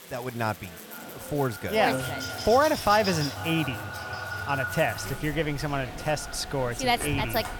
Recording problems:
echo of what is said; strong; throughout; 490 ms later, 10 dB below the speech
animal sounds; noticeable; from 2 s on; 10 dB below the speech
electrical hum; faint; throughout; 50 Hz, 25 dB below the speech
chatter from many people; faint; throughout; 20 dB below the speech
hiss; faint; throughout; 20 dB below the speech

